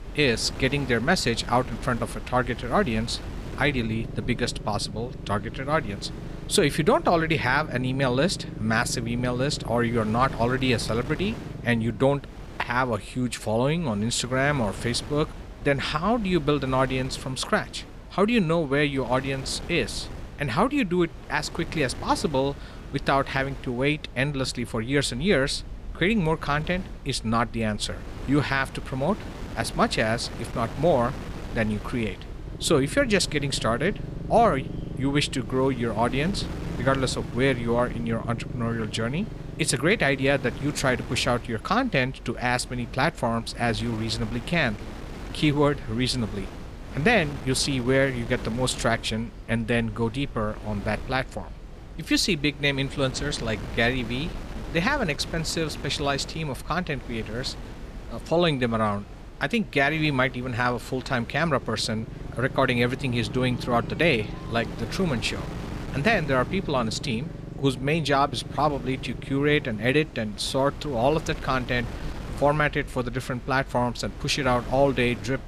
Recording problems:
wind noise on the microphone; occasional gusts; 20 dB below the speech
chatter from many people; faint; throughout; 30 dB below the speech
low rumble; faint; throughout; 20 dB below the speech

